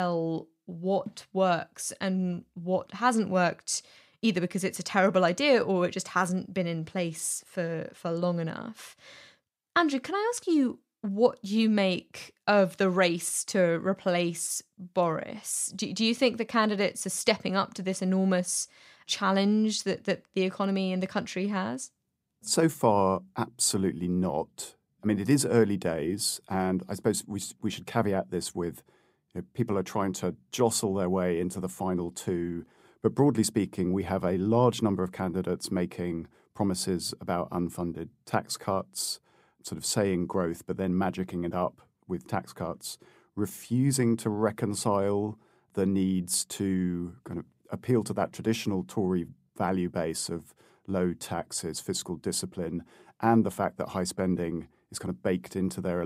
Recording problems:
abrupt cut into speech; at the start and the end

